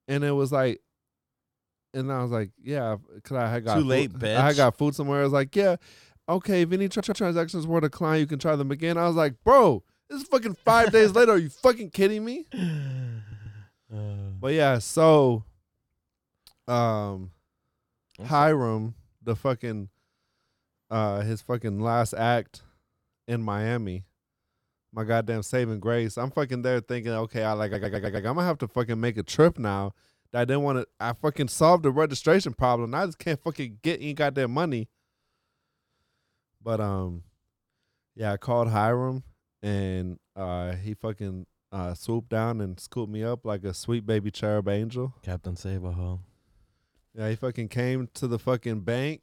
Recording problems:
audio stuttering; at 7 s, at 13 s and at 28 s

